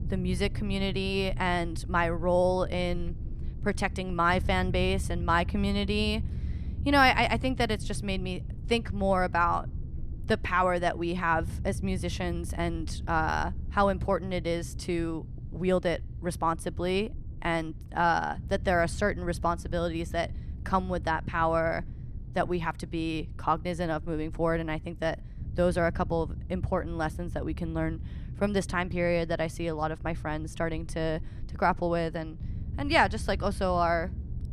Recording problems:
low rumble; faint; throughout; 25 dB below the speech

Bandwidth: 14 kHz